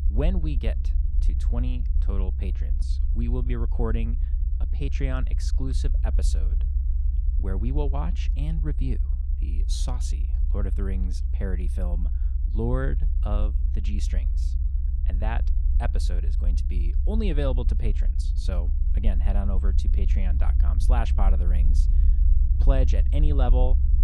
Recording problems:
low rumble; loud; throughout; 9 dB below the speech

